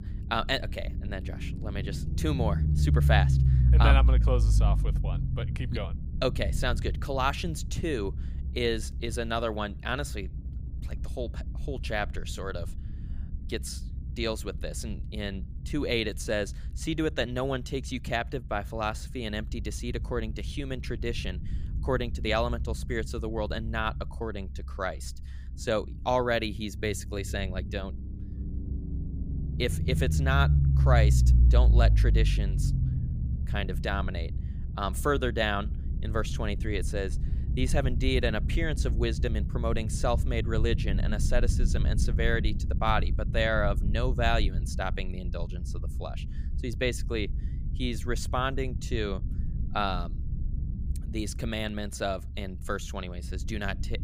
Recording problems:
low rumble; noticeable; throughout; 15 dB below the speech

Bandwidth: 15.5 kHz